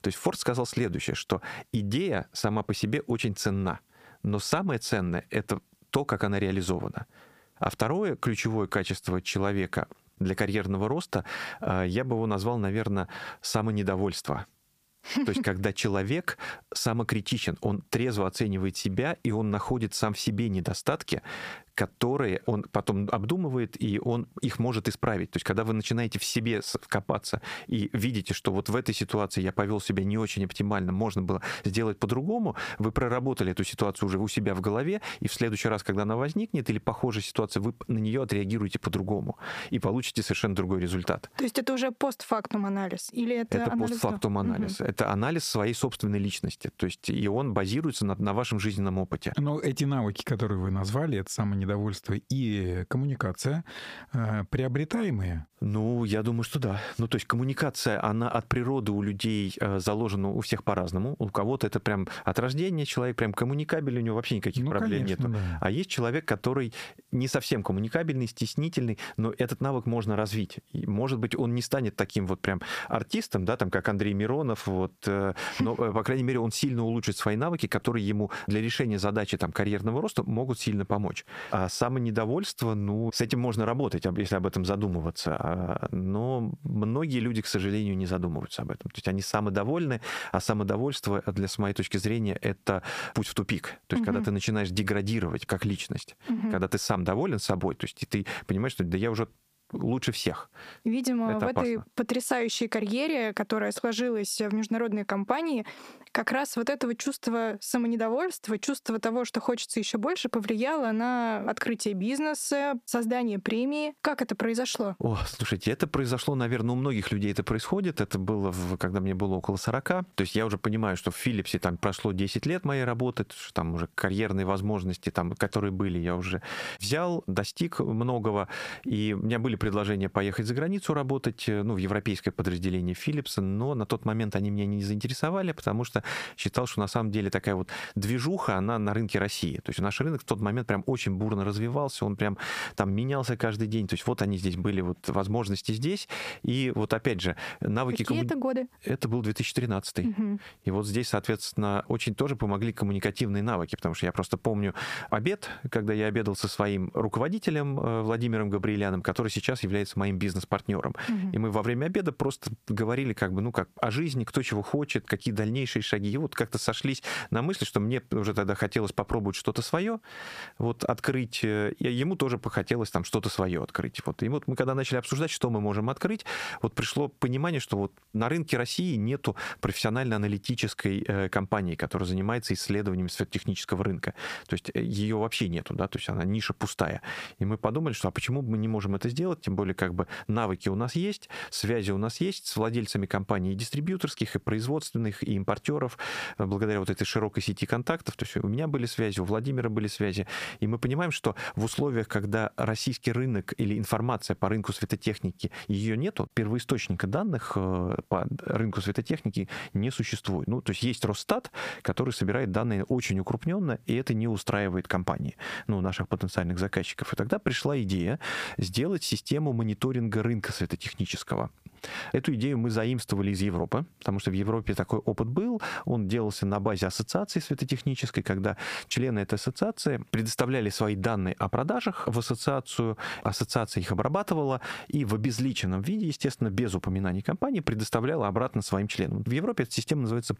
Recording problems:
squashed, flat; heavily

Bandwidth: 15 kHz